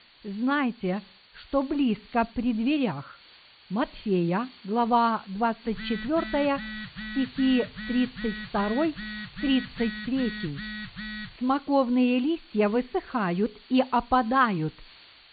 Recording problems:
high frequencies cut off; severe; nothing above 4.5 kHz
hiss; faint; throughout; 25 dB below the speech
phone ringing; noticeable; from 5.5 to 11 s; peak 9 dB below the speech

